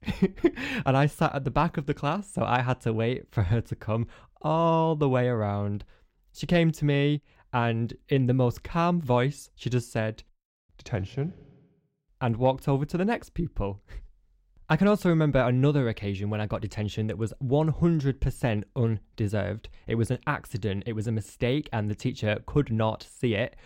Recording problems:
none

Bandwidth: 16 kHz